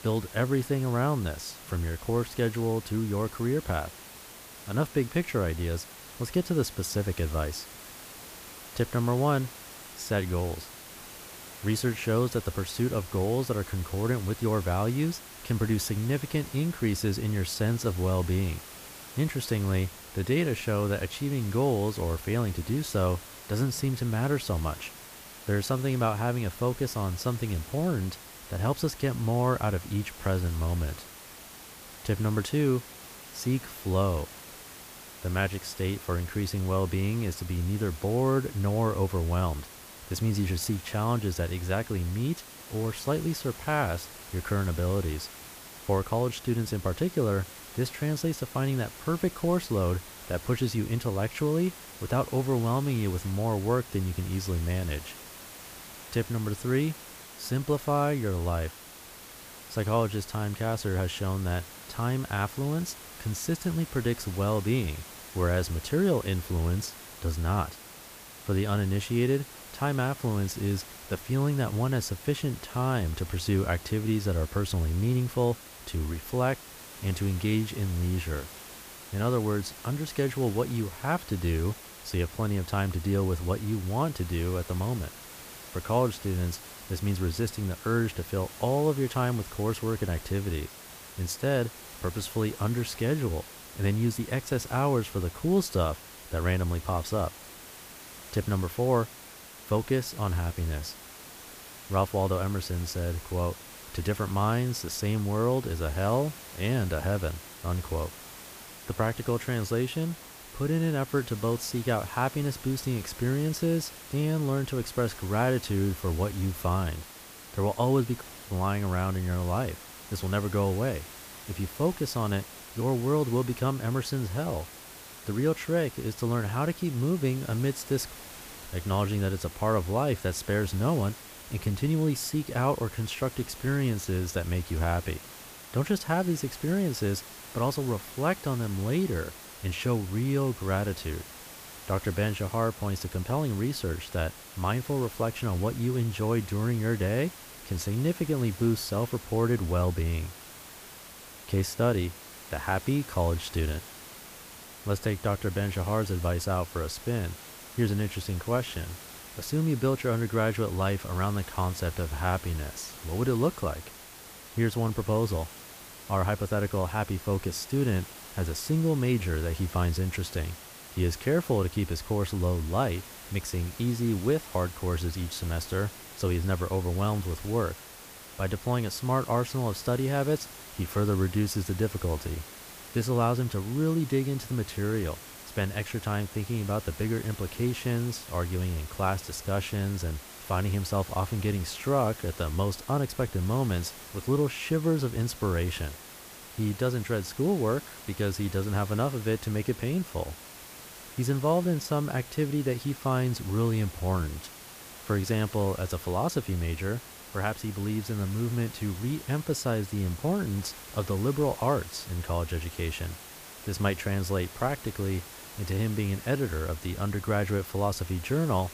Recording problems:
hiss; noticeable; throughout; 15 dB below the speech

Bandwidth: 15 kHz